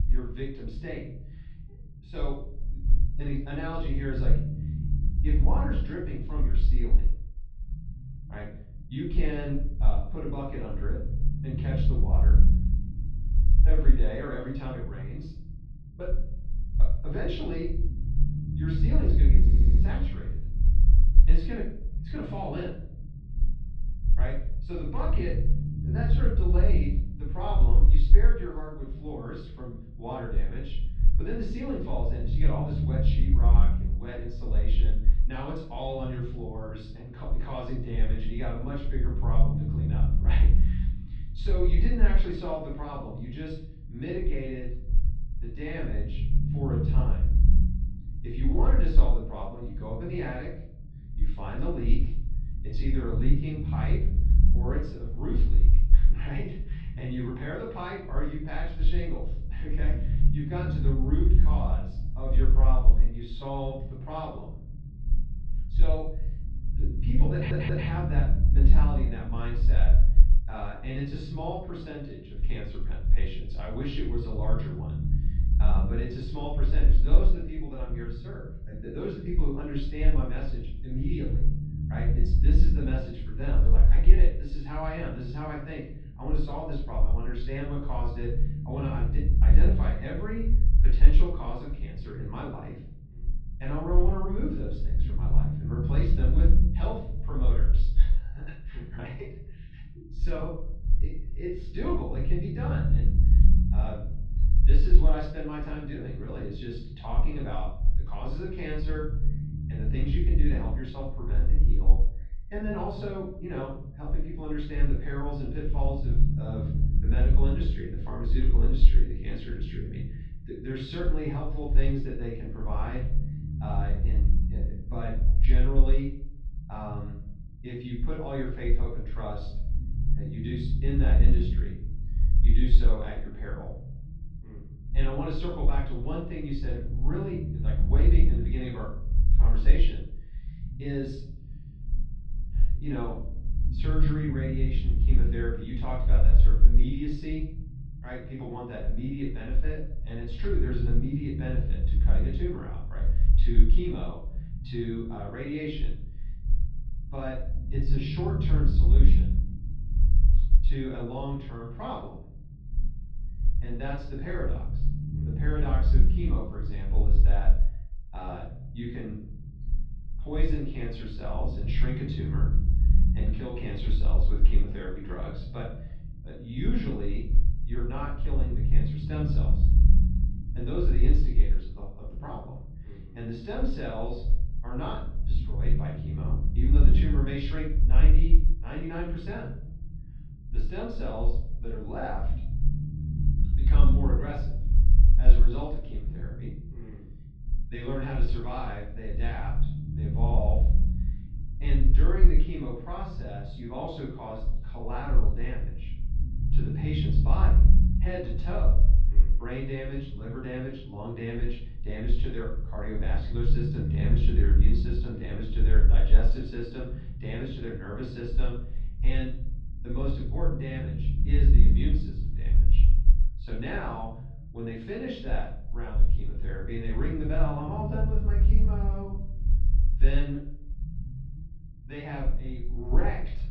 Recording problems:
off-mic speech; far
room echo; noticeable; dies away in 0.6 s
muffled; slightly; fading above 3.5 kHz
low rumble; loud; throughout; 7 dB below the speech
audio stuttering; at 19 s and at 1:07

